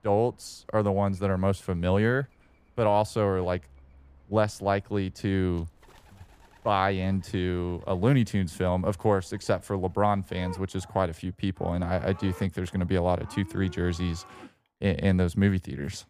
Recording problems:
animal sounds; faint; throughout; 25 dB below the speech

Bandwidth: 15 kHz